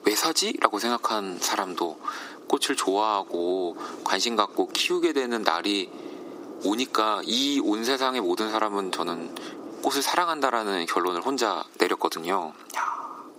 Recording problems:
thin; very; fading below 300 Hz
squashed, flat; heavily
wind noise on the microphone; occasional gusts; 20 dB below the speech

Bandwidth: 15.5 kHz